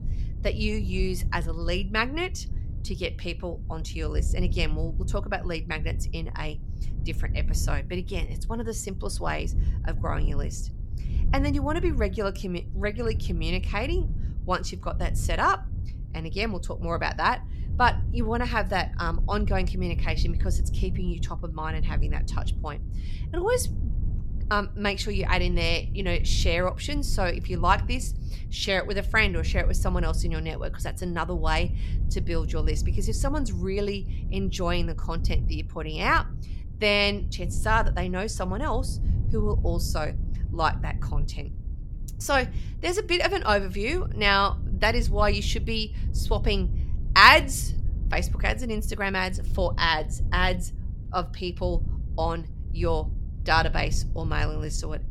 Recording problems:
wind noise on the microphone; occasional gusts; 20 dB below the speech

